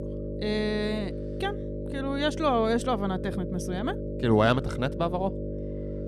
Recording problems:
electrical hum; loud; throughout; 50 Hz, 10 dB below the speech

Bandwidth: 13.5 kHz